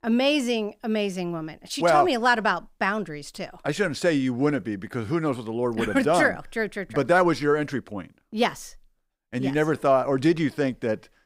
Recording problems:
none

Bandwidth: 15.5 kHz